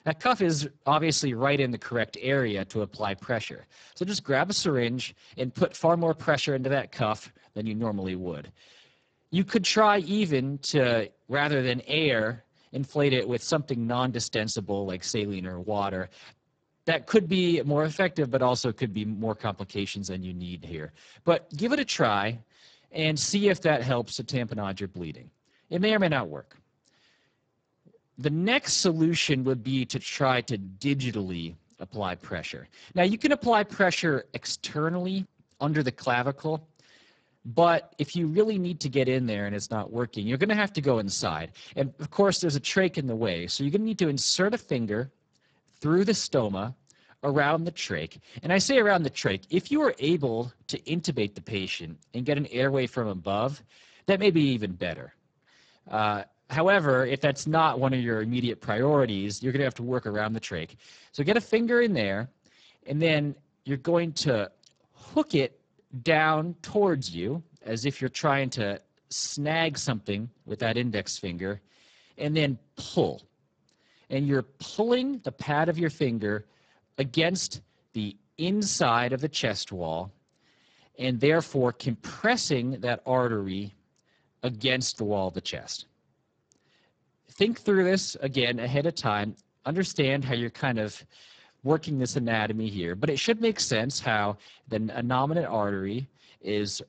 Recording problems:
garbled, watery; badly; nothing above 7.5 kHz

